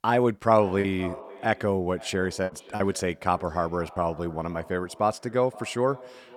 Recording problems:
echo of what is said; faint; throughout; 520 ms later, 20 dB below the speech
choppy; very; at 1 s and from 2.5 to 4 s; 5% of the speech affected

